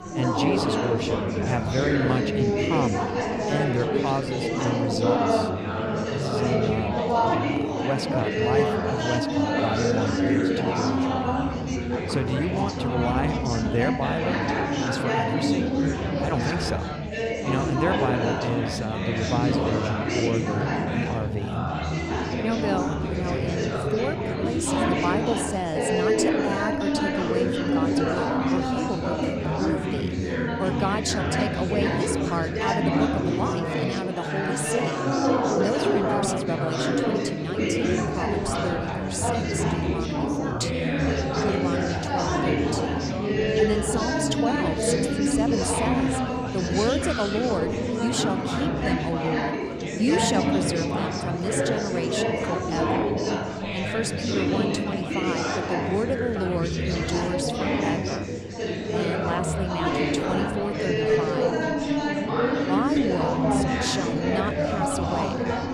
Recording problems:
chatter from many people; very loud; throughout; 5 dB above the speech

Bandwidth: 15 kHz